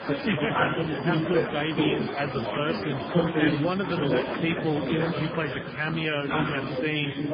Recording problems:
garbled, watery; badly
chatter from many people; very loud; throughout; 1 dB above the speech

